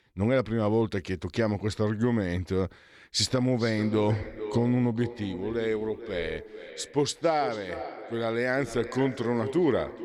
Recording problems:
echo of what is said; strong; from 3.5 s on; 440 ms later, 10 dB below the speech

